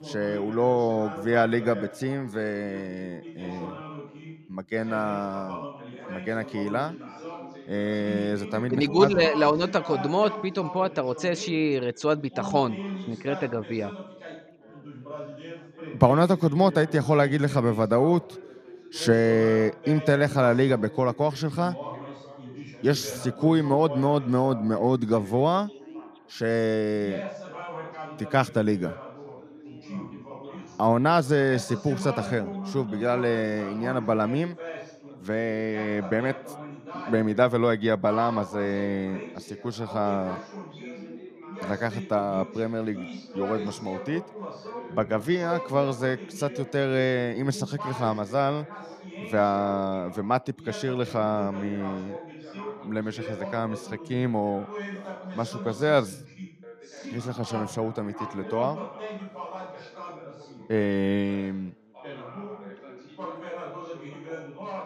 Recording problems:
background chatter; noticeable; throughout; 3 voices, 15 dB below the speech

